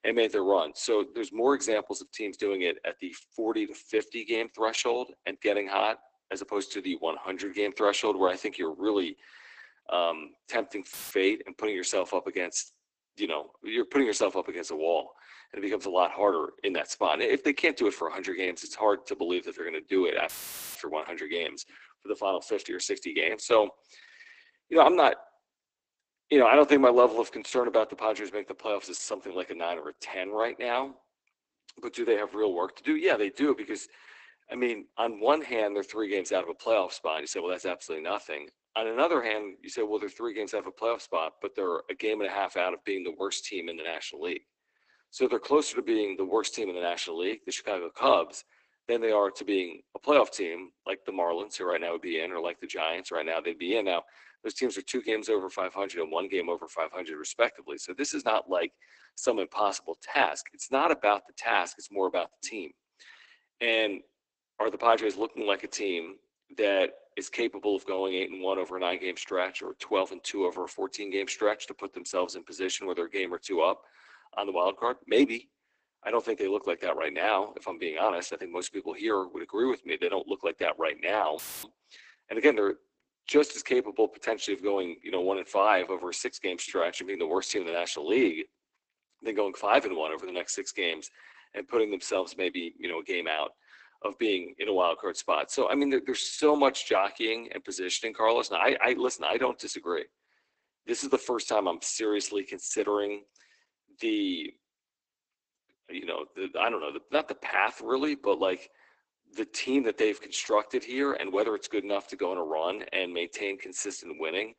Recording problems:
garbled, watery; badly; nothing above 8 kHz
thin; somewhat; fading below 250 Hz
audio cutting out; filled with static; at 11 s, at 20 s and at 1:21

